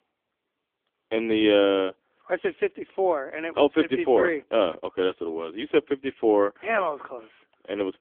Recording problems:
phone-call audio; poor line; nothing above 3.5 kHz

